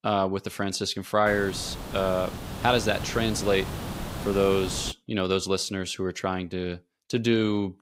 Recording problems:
hiss; loud; from 1.5 to 5 s; 9 dB below the speech

